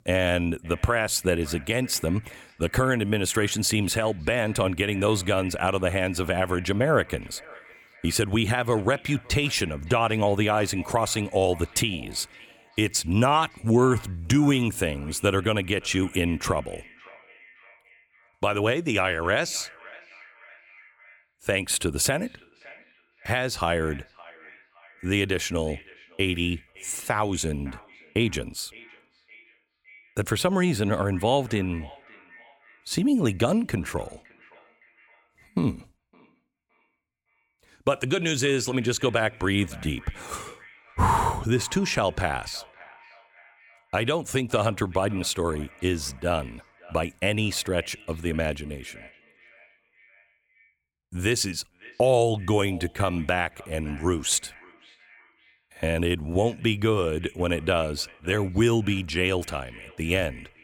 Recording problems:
echo of what is said; faint; throughout; 560 ms later, 25 dB below the speech

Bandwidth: 17.5 kHz